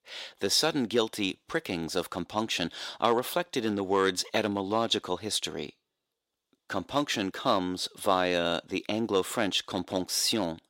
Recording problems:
thin; somewhat; fading below 400 Hz

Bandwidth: 16 kHz